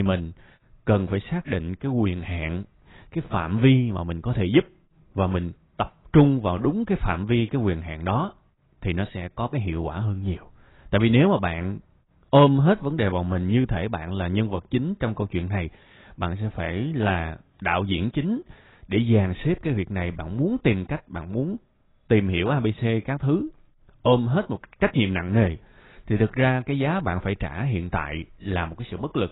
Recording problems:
garbled, watery; badly; nothing above 4 kHz
abrupt cut into speech; at the start

